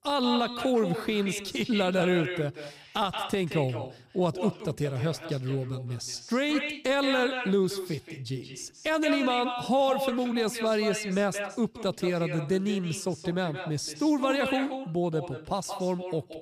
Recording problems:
echo of what is said; strong; throughout; 180 ms later, 8 dB below the speech

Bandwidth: 15 kHz